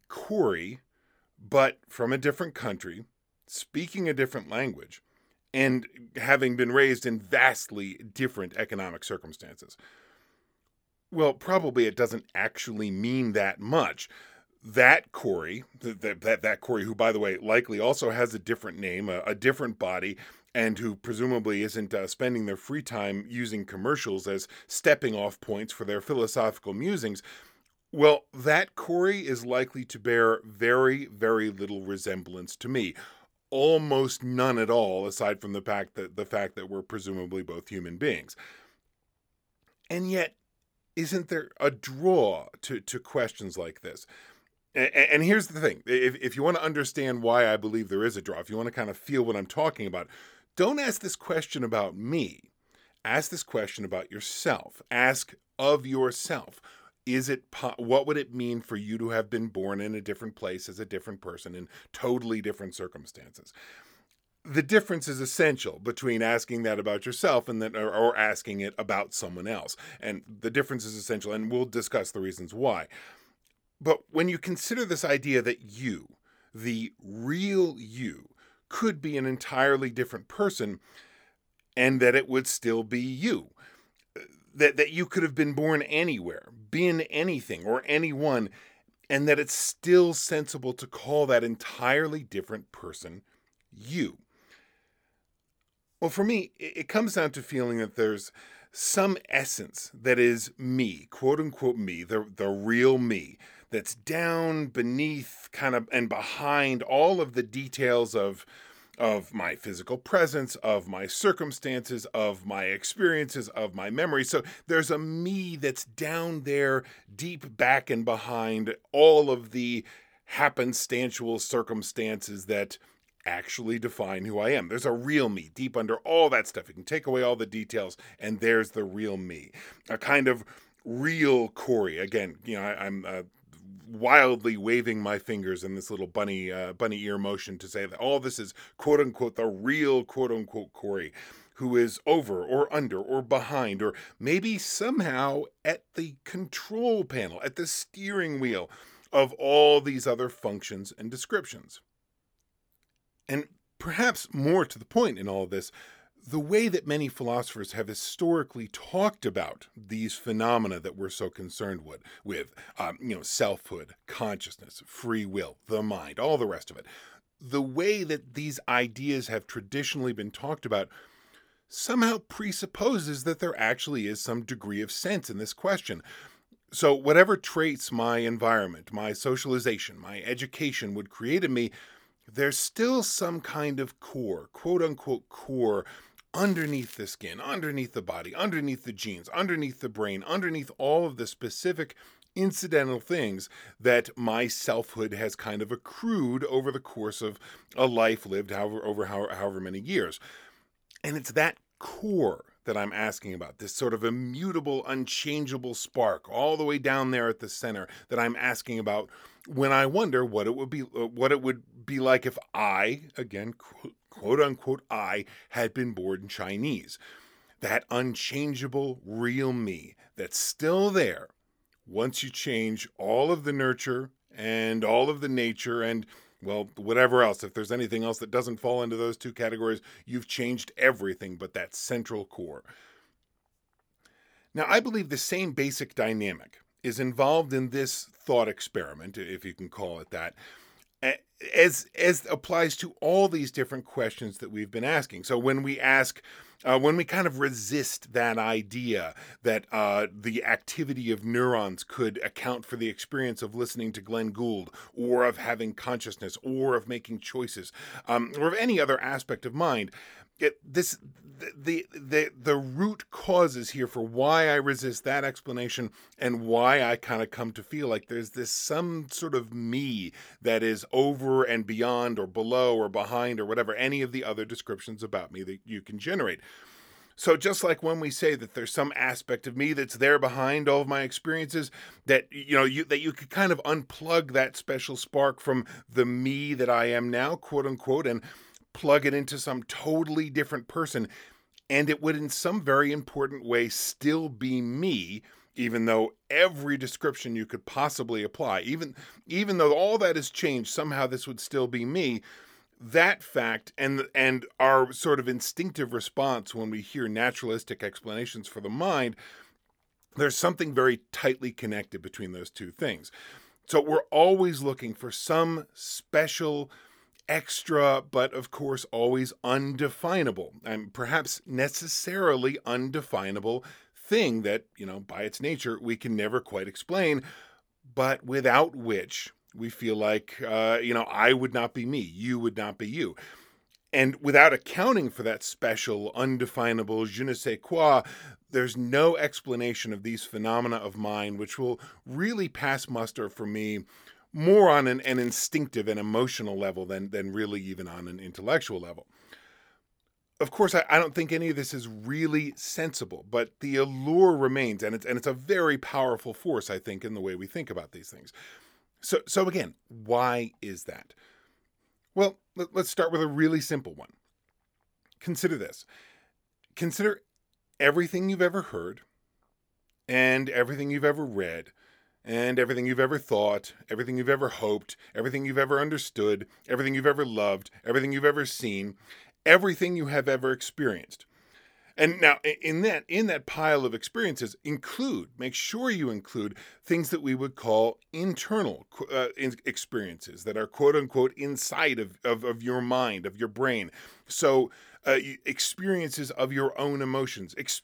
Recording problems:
crackling; faint; at 3:06 and at 5:45; 20 dB below the speech

